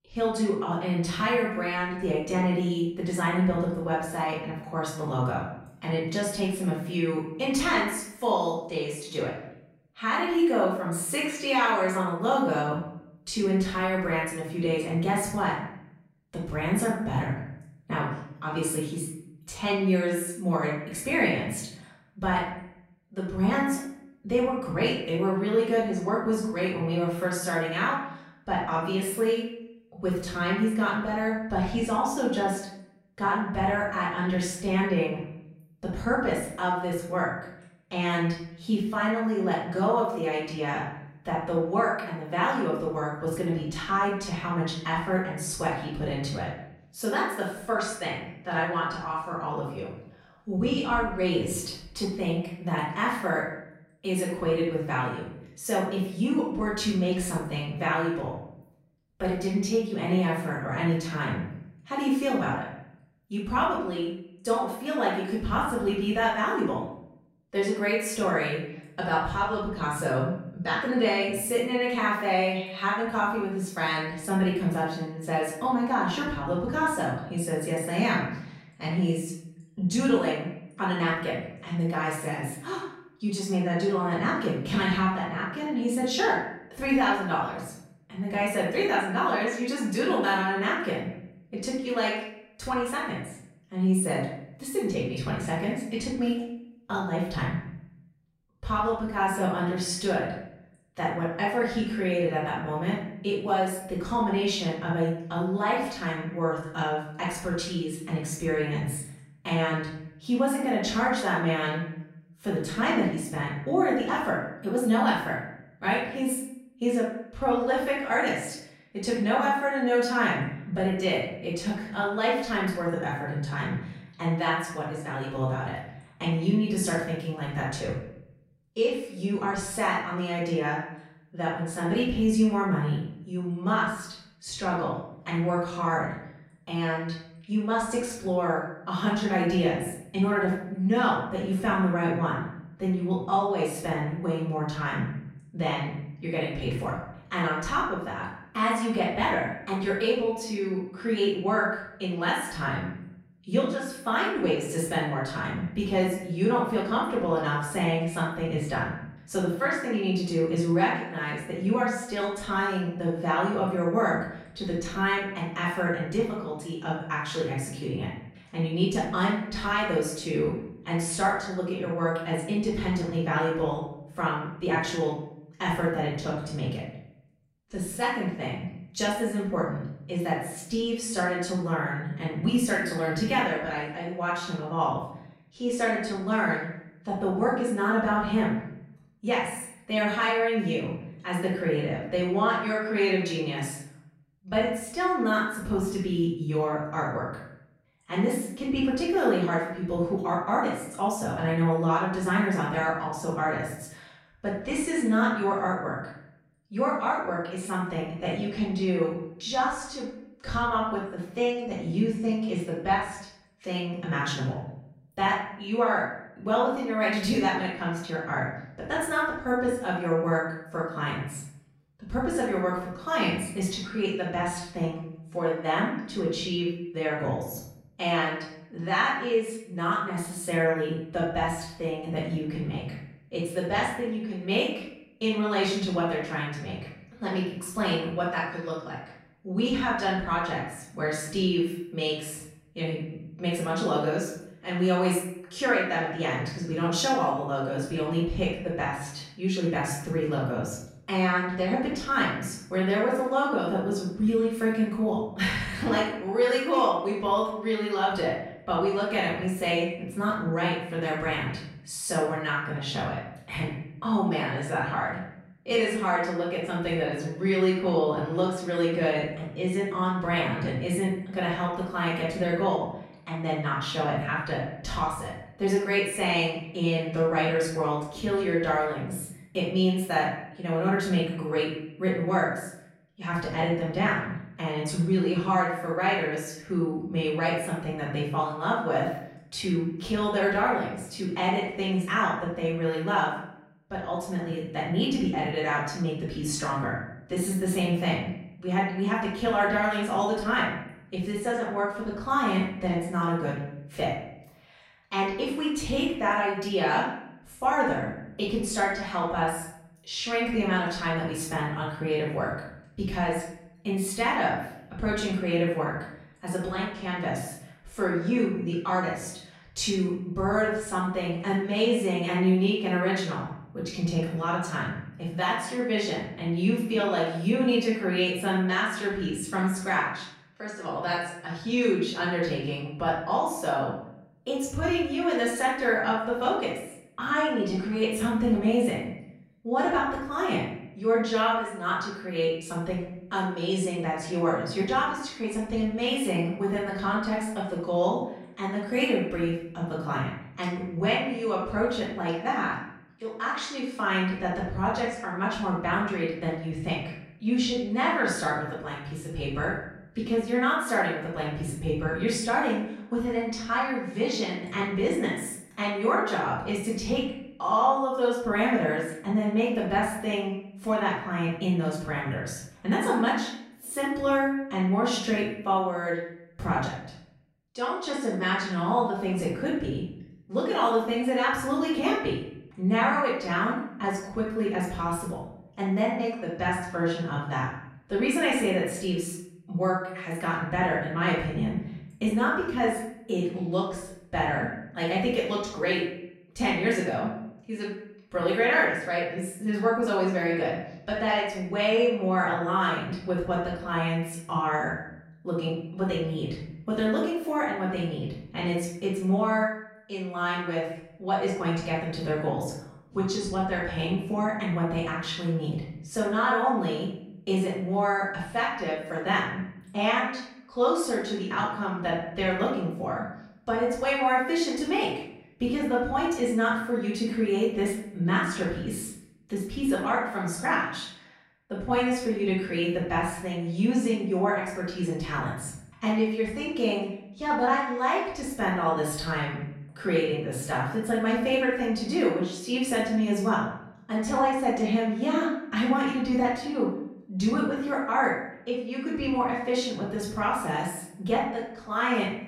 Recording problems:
off-mic speech; far
room echo; noticeable; dies away in 0.7 s

